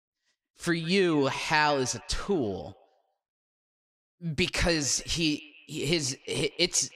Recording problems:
echo of what is said; faint; throughout; 160 ms later, 20 dB below the speech

